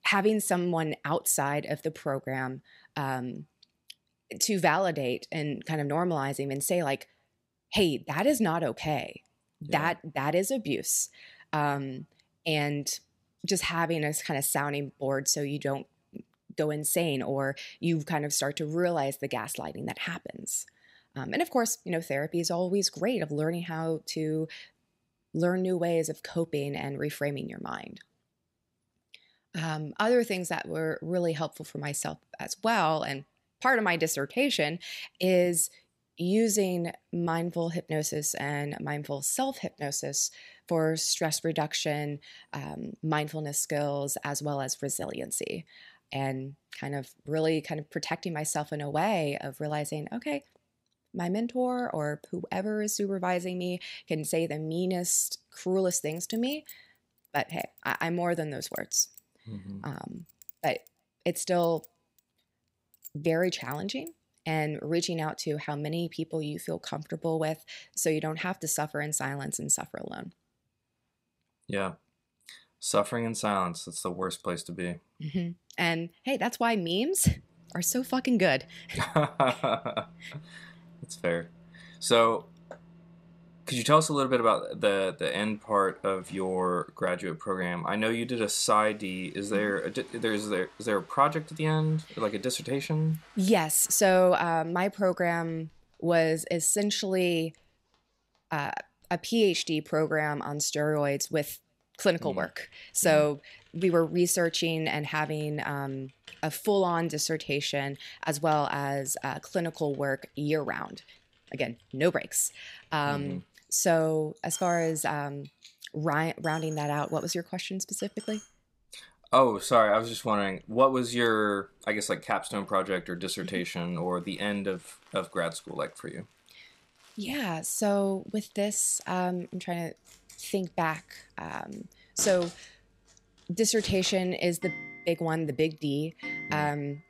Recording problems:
household noises; faint; from 1:17 on; 20 dB below the speech
clattering dishes; faint; from 56 s to 1:04; peak 10 dB below the speech

